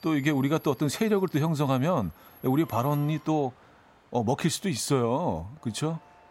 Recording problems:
train or aircraft noise; faint; throughout; 25 dB below the speech

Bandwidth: 16 kHz